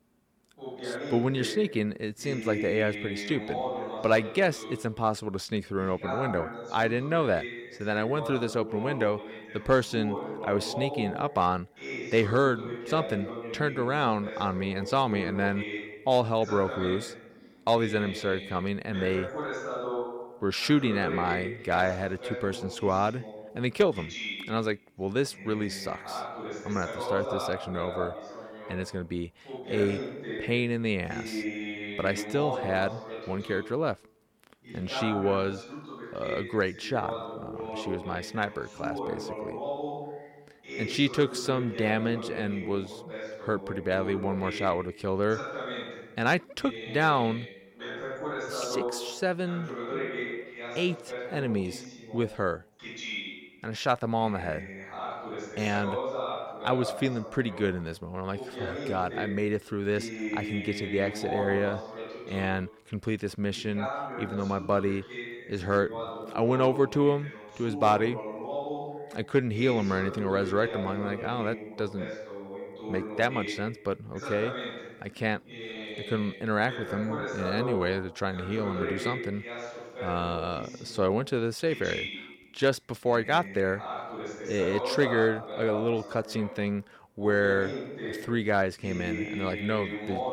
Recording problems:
voice in the background; loud; throughout; 8 dB below the speech

